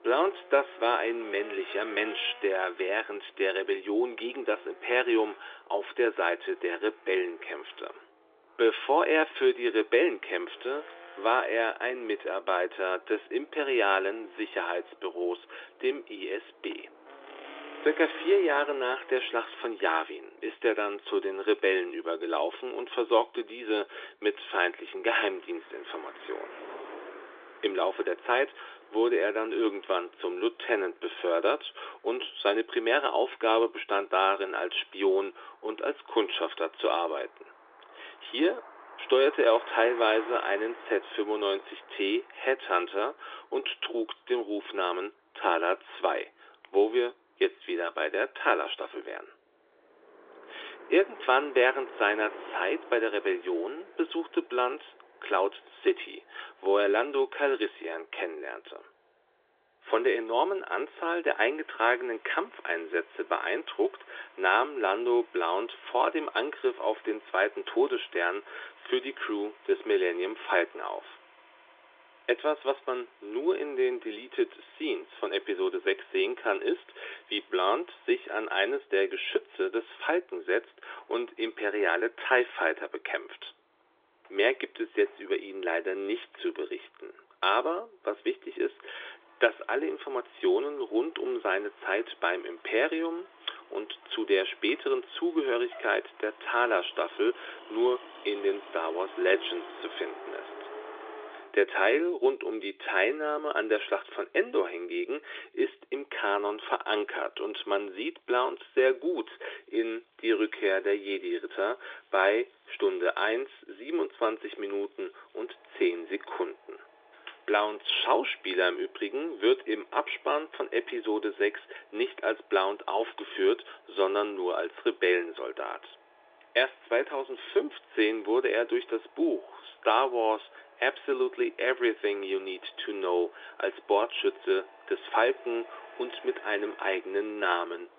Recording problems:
phone-call audio
traffic noise; faint; throughout; 20 dB below the speech

